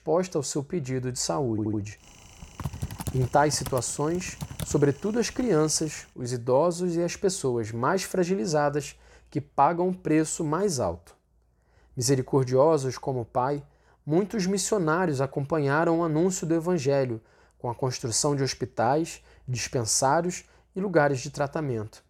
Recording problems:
audio stuttering; at 1.5 s
keyboard typing; noticeable; from 2.5 to 5.5 s; peak 9 dB below the speech

